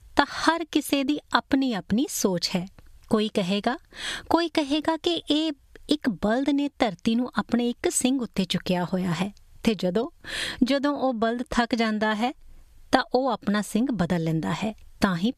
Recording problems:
squashed, flat; somewhat

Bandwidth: 14.5 kHz